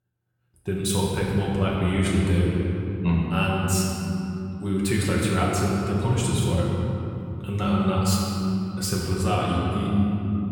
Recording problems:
room echo; strong; dies away in 3 s
off-mic speech; far

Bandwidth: 18.5 kHz